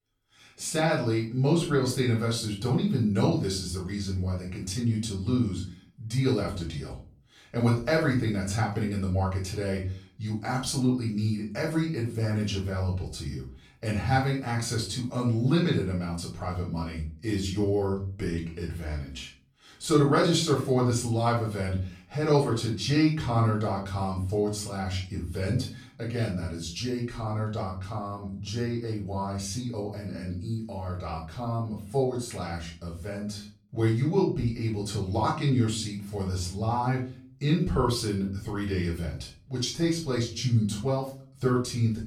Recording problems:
off-mic speech; far
room echo; slight; dies away in 0.3 s

